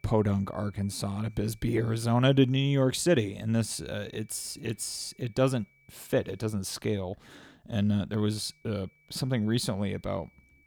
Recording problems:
high-pitched whine; faint; until 2.5 s, from 3.5 to 6.5 s and from 8 s on; 2.5 kHz, 35 dB below the speech

